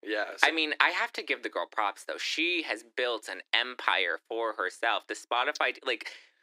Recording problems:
thin; very; fading below 300 Hz

